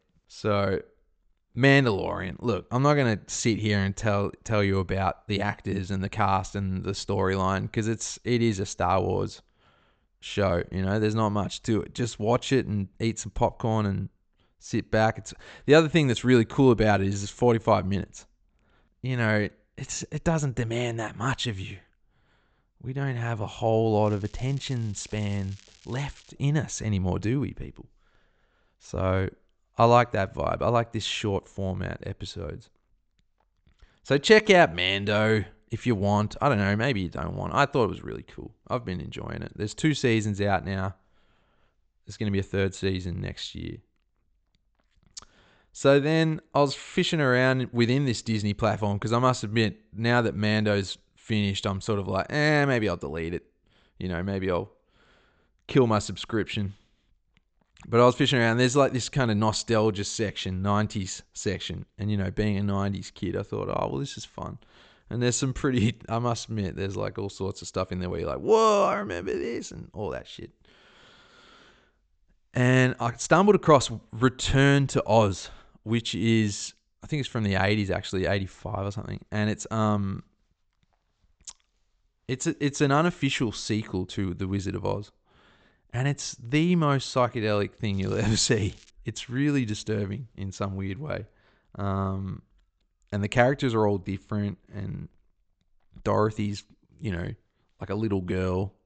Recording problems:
high frequencies cut off; noticeable; nothing above 8 kHz
crackling; faint; from 24 to 26 s and at 1:28; 25 dB below the speech

